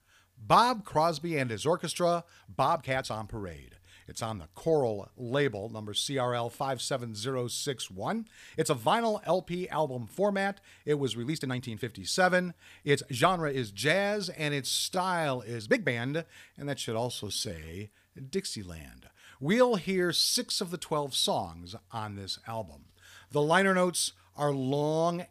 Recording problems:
uneven, jittery; strongly; from 2.5 to 18 s

